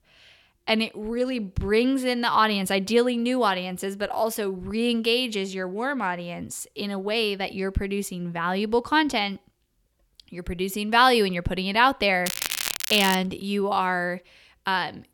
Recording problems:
crackling; loud; at 12 s; 4 dB below the speech

